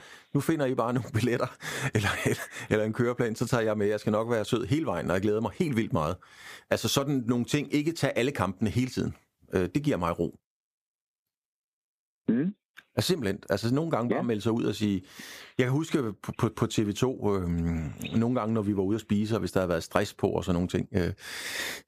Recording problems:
squashed, flat; somewhat

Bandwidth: 15 kHz